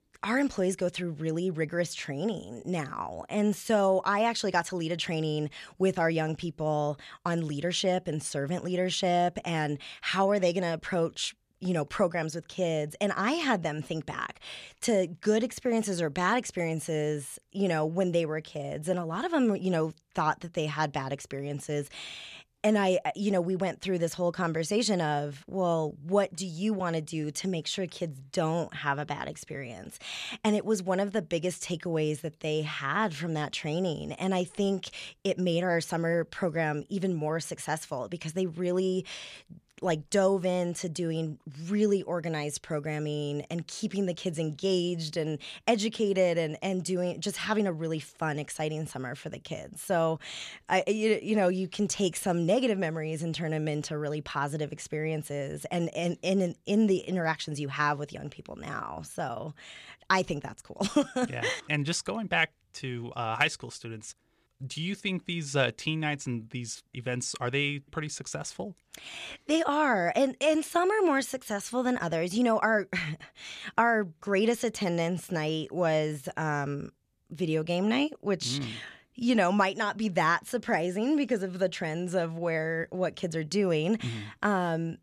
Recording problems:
none

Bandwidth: 14.5 kHz